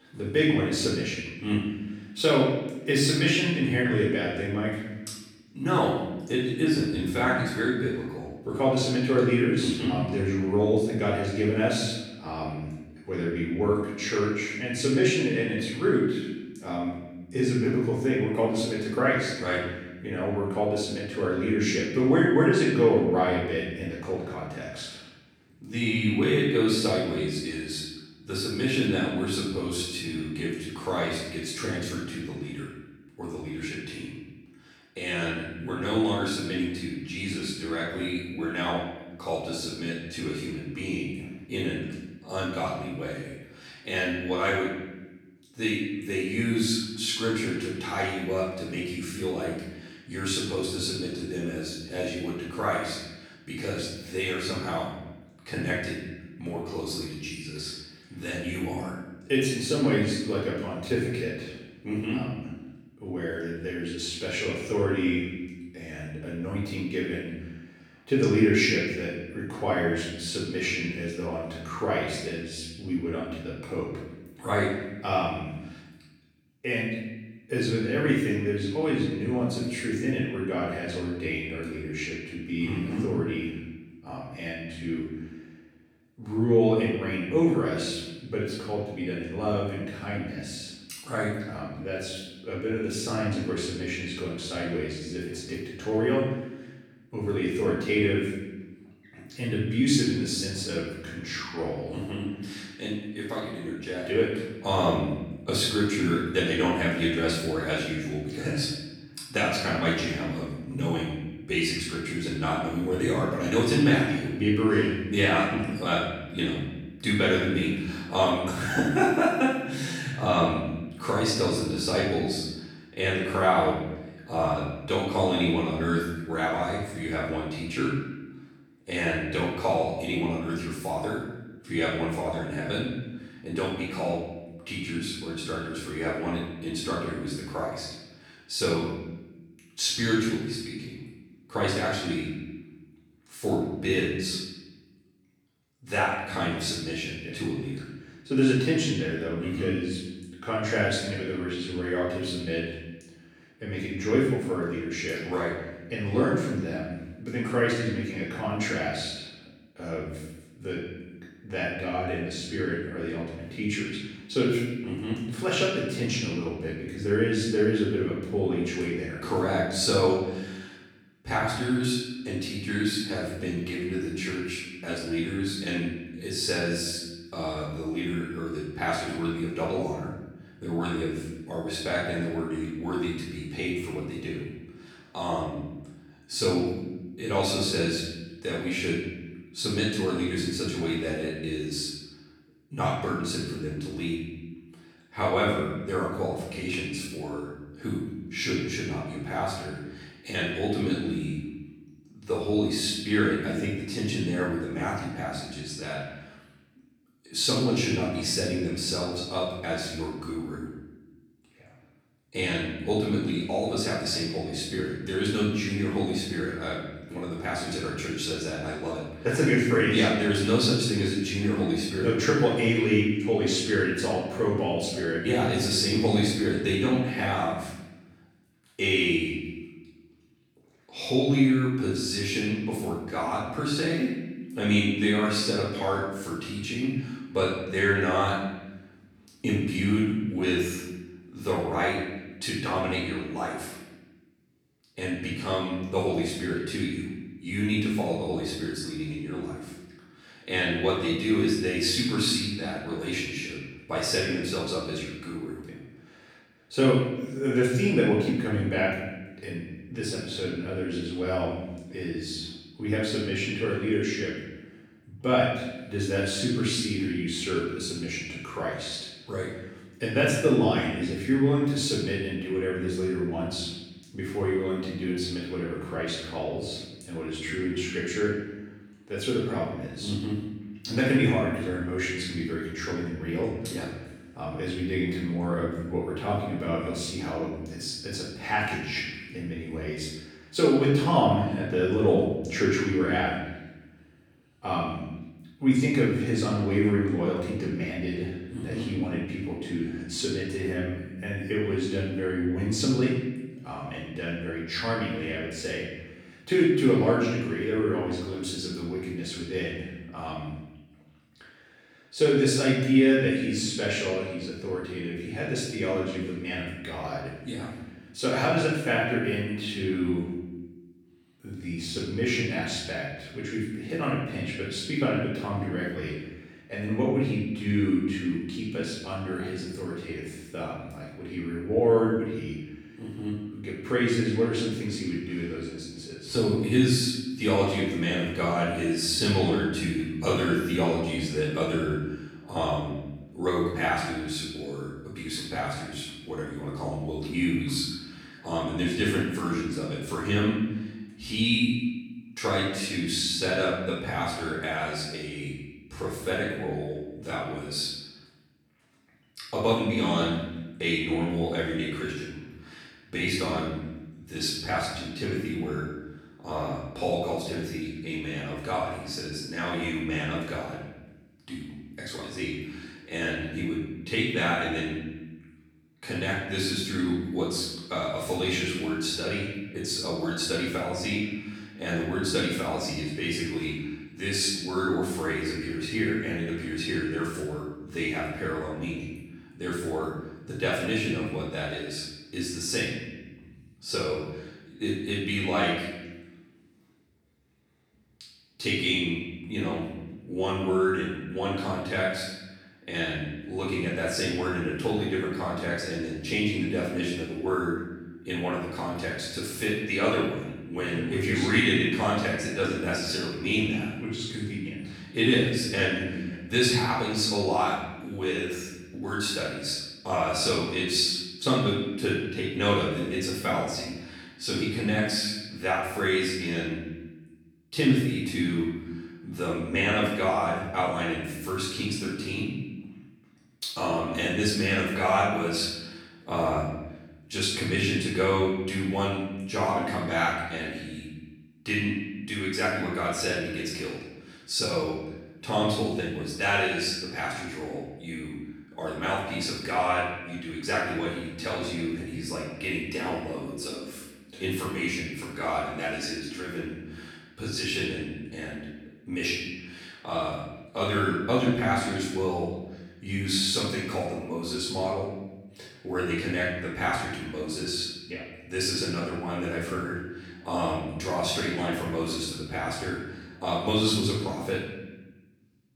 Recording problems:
off-mic speech; far
room echo; noticeable; dies away in 1.1 s

